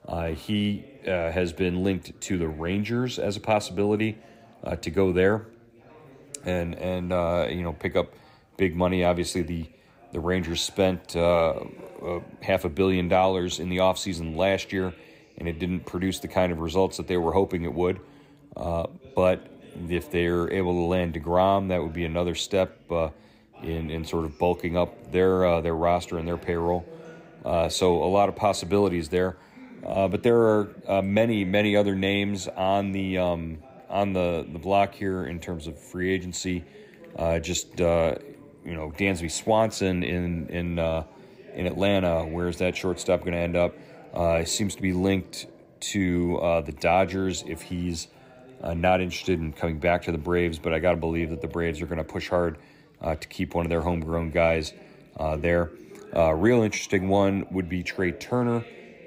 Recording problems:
background chatter; faint; throughout; 3 voices, 25 dB below the speech

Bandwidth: 15.5 kHz